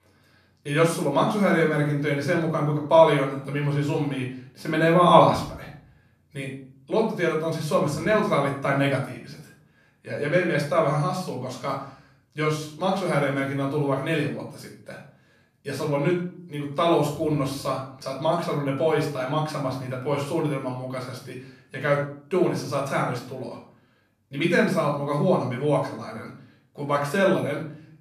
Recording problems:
off-mic speech; far
room echo; noticeable; dies away in 0.5 s

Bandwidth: 14.5 kHz